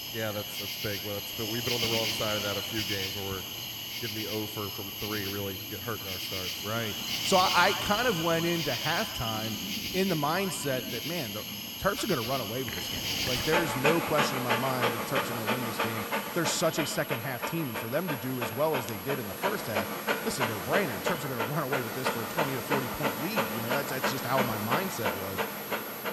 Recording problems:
echo of what is said; noticeable; throughout; 120 ms later, 15 dB below the speech
animal sounds; very loud; throughout; as loud as the speech
high-pitched whine; loud; throughout; 11.5 kHz, 10 dB below the speech

